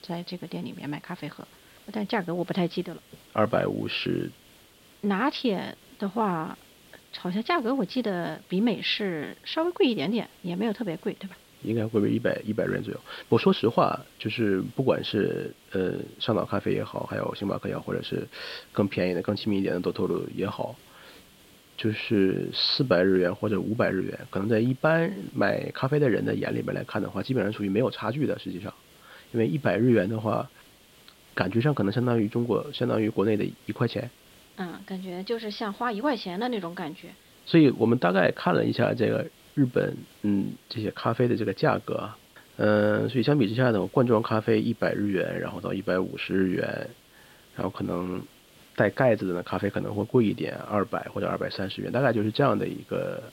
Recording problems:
high frequencies cut off; noticeable; nothing above 5.5 kHz
hiss; faint; throughout; 25 dB below the speech

